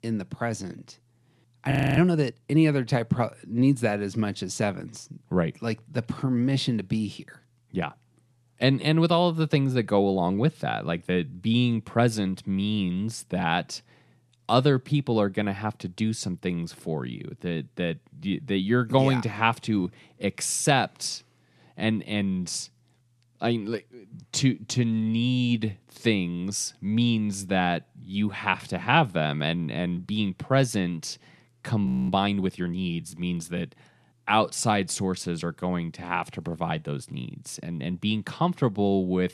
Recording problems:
audio freezing; at 1.5 s and at 32 s

